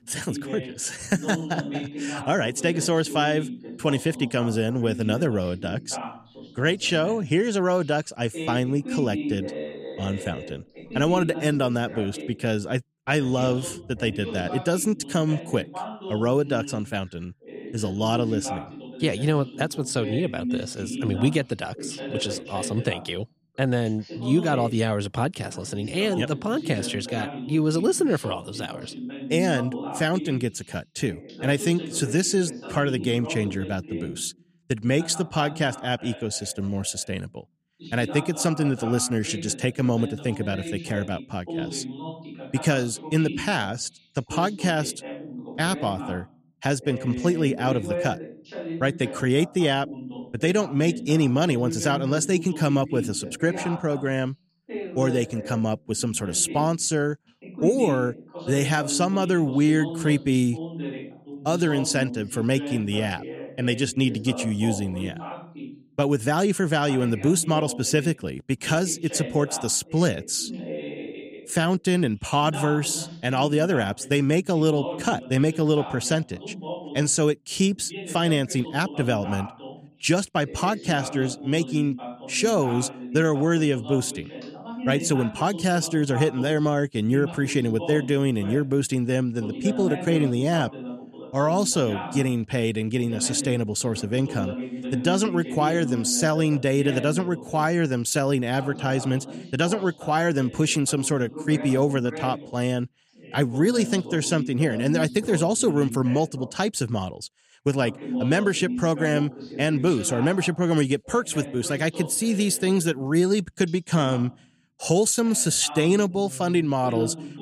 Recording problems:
voice in the background; noticeable; throughout; 10 dB below the speech

